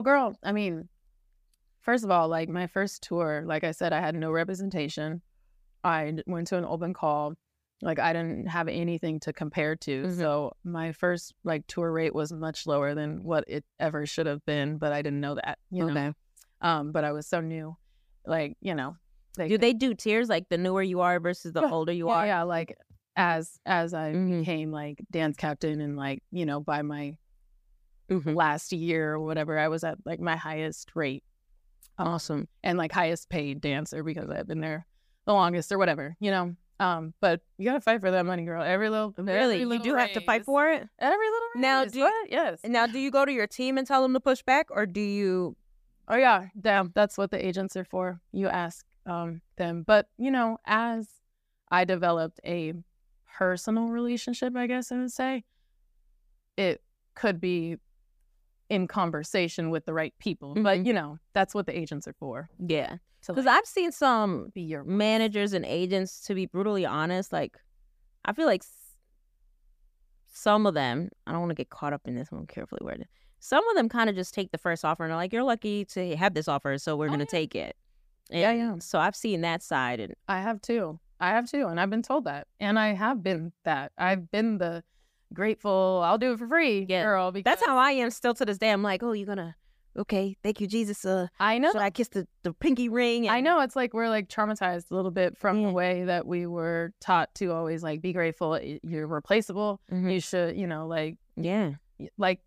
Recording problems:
abrupt cut into speech; at the start

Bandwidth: 15 kHz